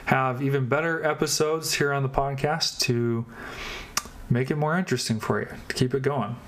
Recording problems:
squashed, flat; somewhat

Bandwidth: 14.5 kHz